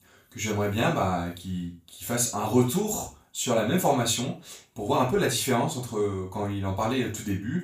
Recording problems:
off-mic speech; far
room echo; noticeable; dies away in 0.3 s

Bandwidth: 15 kHz